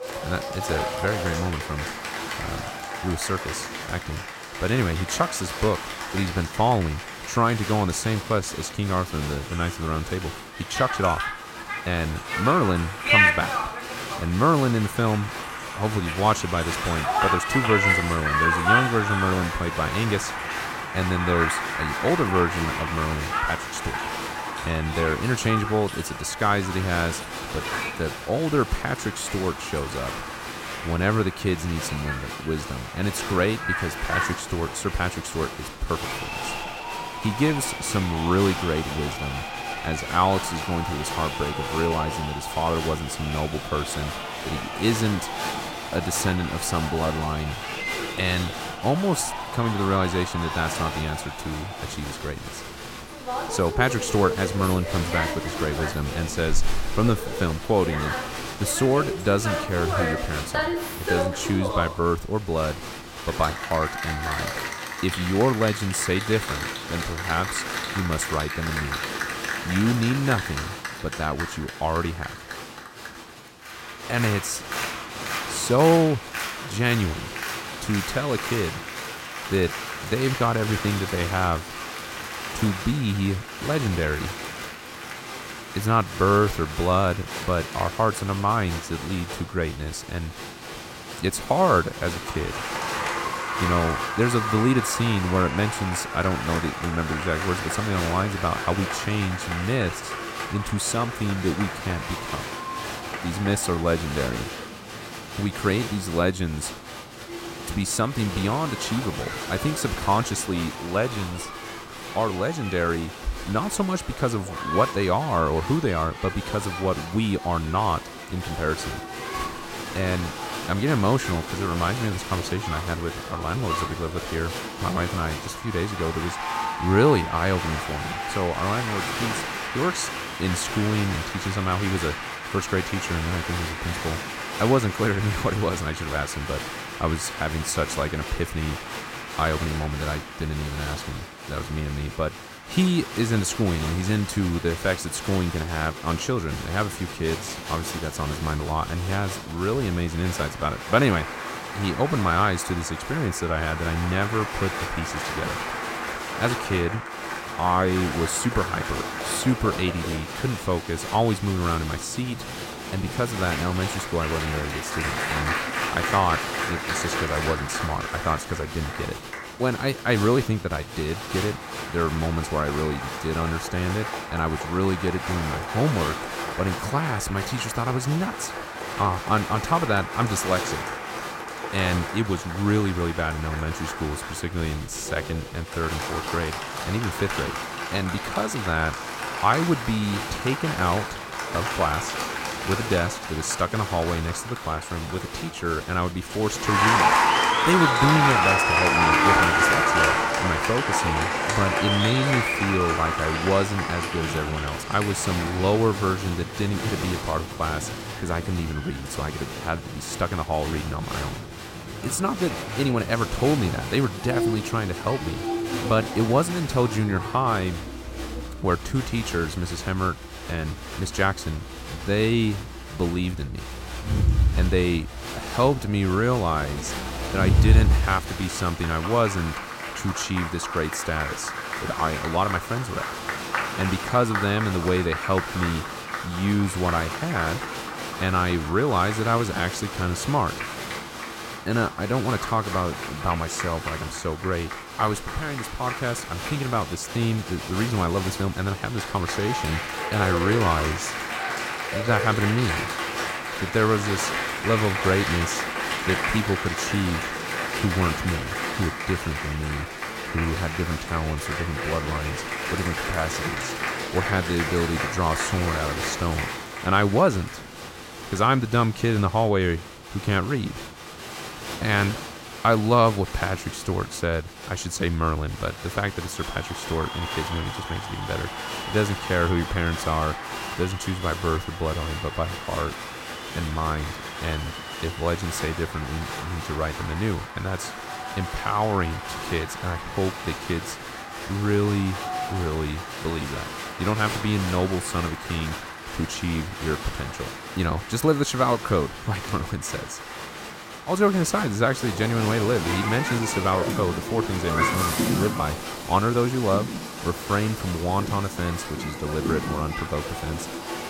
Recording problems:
crowd noise; loud; throughout; 3 dB below the speech

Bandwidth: 16 kHz